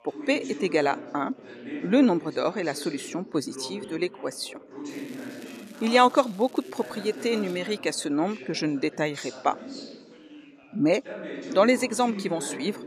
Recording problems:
background chatter; noticeable; throughout; 4 voices, 15 dB below the speech
crackling; faint; from 5 to 7.5 s; 25 dB below the speech

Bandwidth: 14 kHz